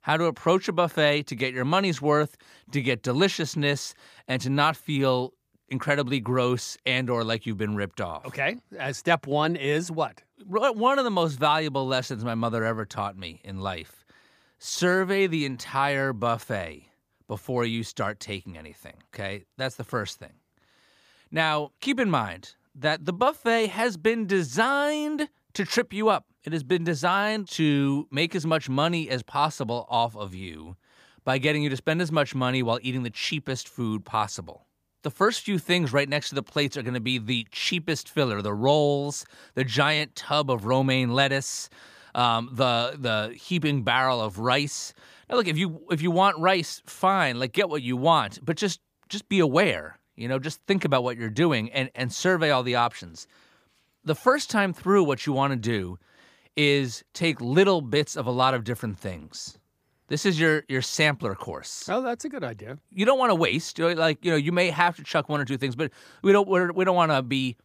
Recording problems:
none

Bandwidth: 15 kHz